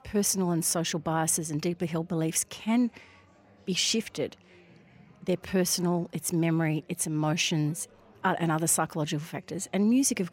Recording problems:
chatter from many people; faint; throughout; 30 dB below the speech

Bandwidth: 16 kHz